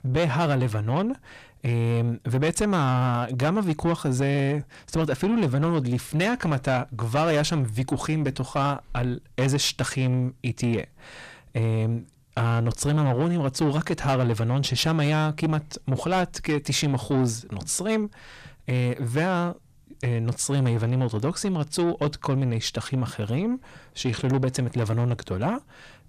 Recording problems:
distortion; slight; 10 dB below the speech

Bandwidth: 14.5 kHz